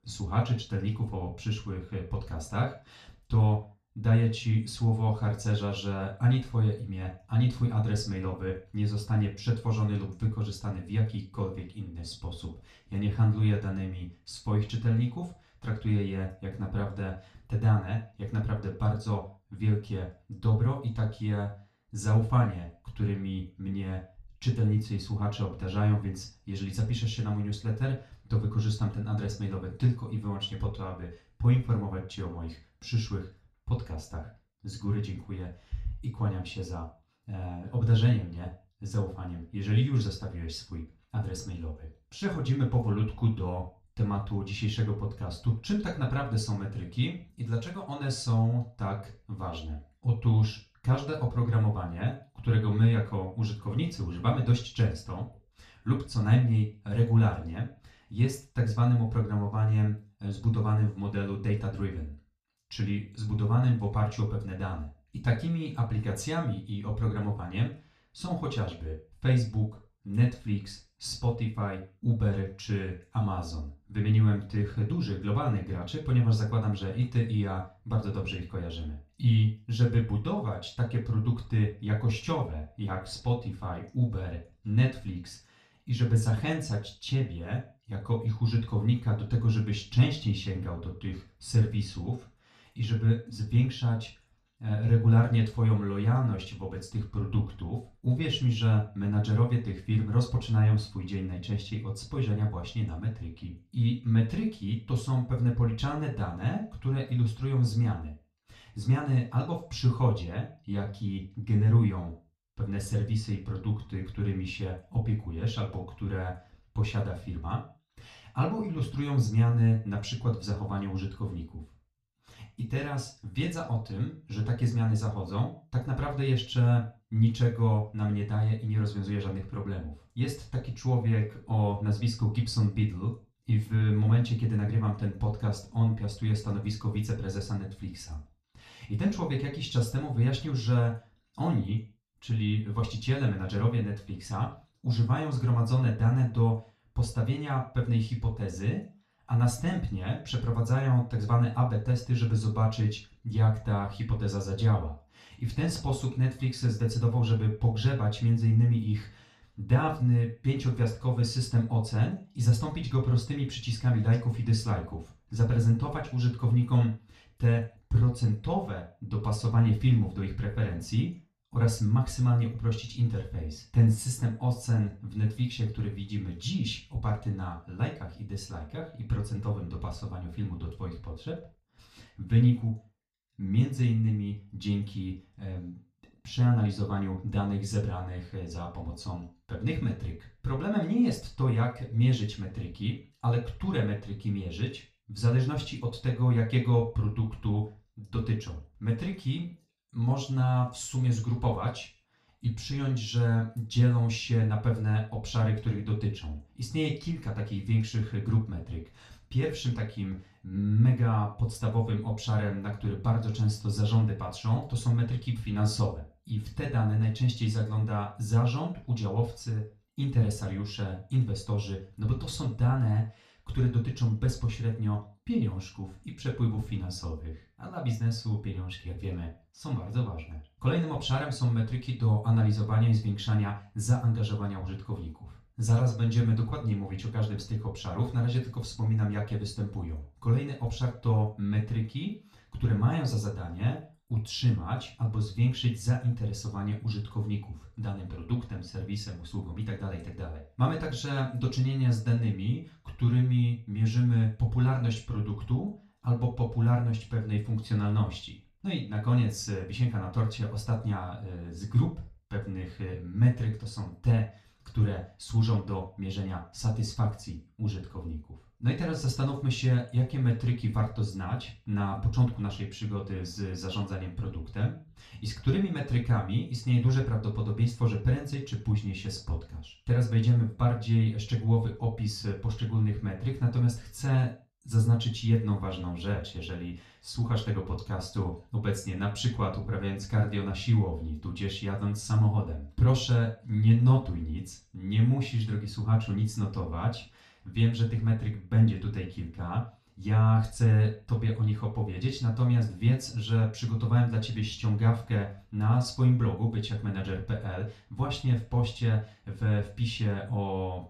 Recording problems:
off-mic speech; far
room echo; slight; dies away in 0.3 s

